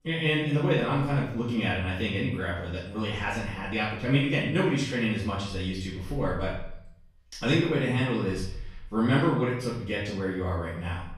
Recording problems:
off-mic speech; far
room echo; noticeable; dies away in 0.6 s

